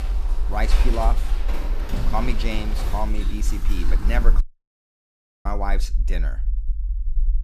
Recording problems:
animal sounds; loud; until 4.5 s; 2 dB below the speech
low rumble; faint; throughout; 20 dB below the speech
audio cutting out; at 4.5 s for 1 s

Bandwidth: 14.5 kHz